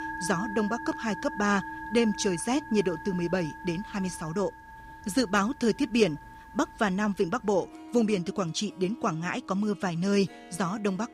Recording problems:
background music; noticeable; throughout; 15 dB below the speech

